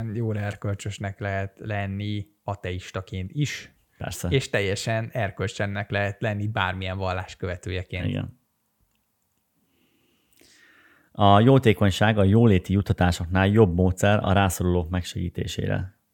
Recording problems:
abrupt cut into speech; at the start

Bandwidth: 18 kHz